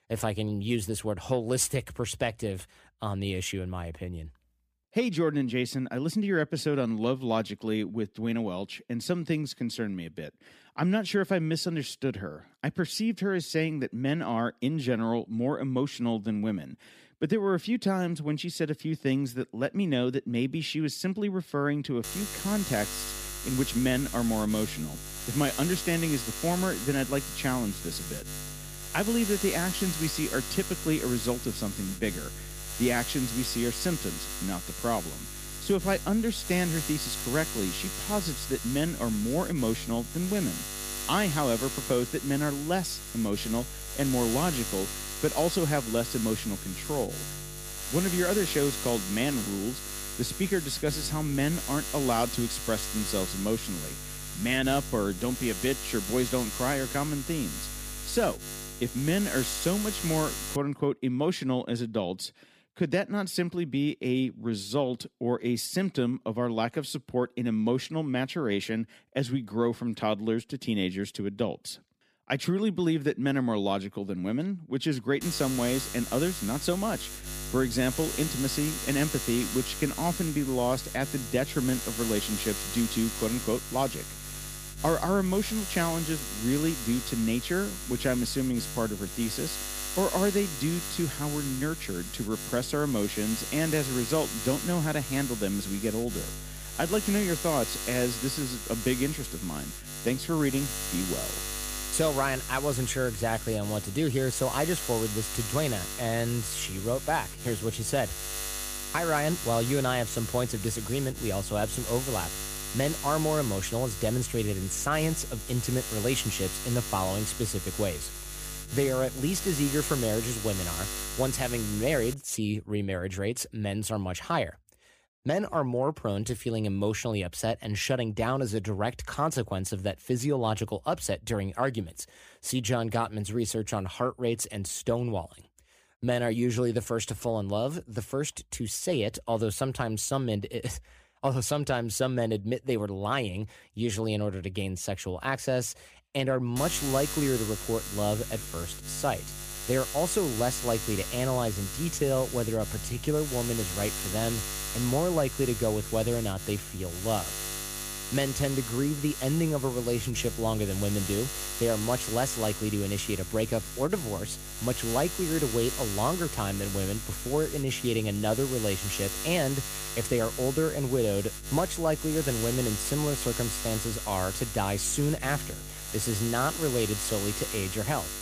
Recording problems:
electrical hum; loud; from 22 s to 1:01, from 1:15 to 2:02 and from 2:27 on; 50 Hz, 5 dB below the speech

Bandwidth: 15 kHz